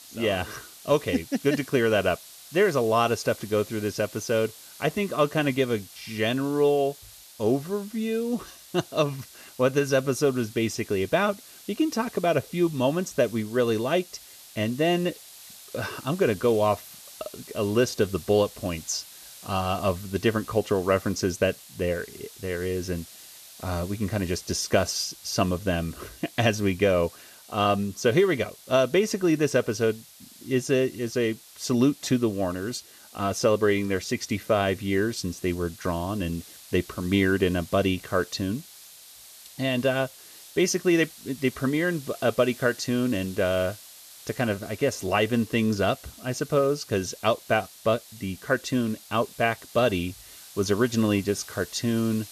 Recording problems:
hiss; noticeable; throughout; 20 dB below the speech

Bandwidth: 14 kHz